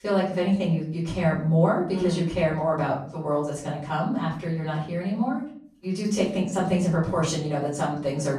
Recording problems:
off-mic speech; far
room echo; noticeable; dies away in 0.6 s

